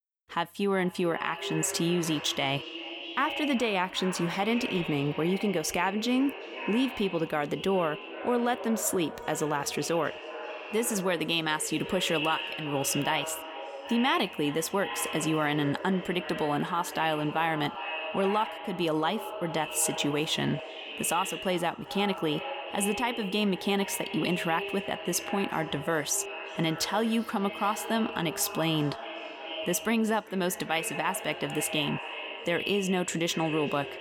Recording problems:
echo of what is said; strong; throughout; 380 ms later, 8 dB below the speech

